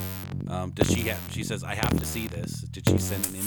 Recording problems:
background music; very loud; throughout; 4 dB above the speech
abrupt cut into speech; at the end

